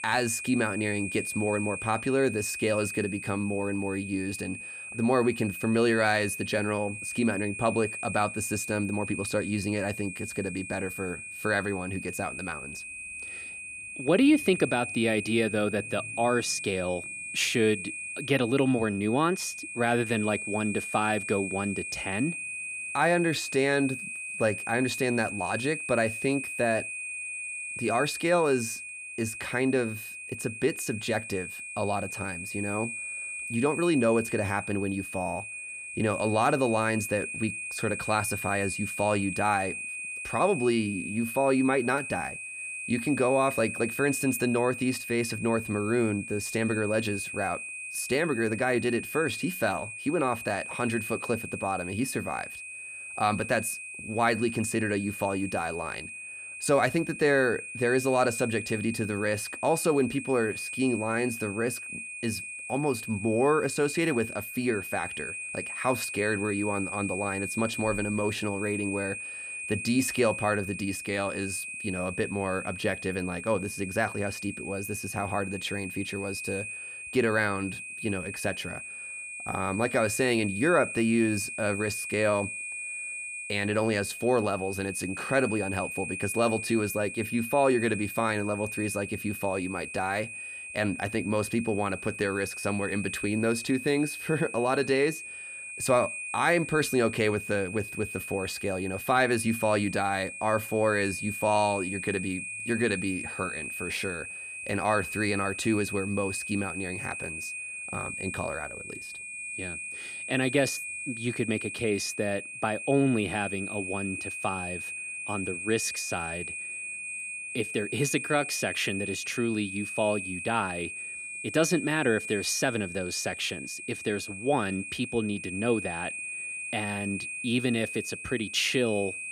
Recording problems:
high-pitched whine; loud; throughout; 2.5 kHz, 7 dB below the speech

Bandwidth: 14.5 kHz